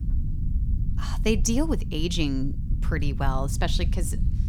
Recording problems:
low rumble; noticeable; throughout; 15 dB below the speech

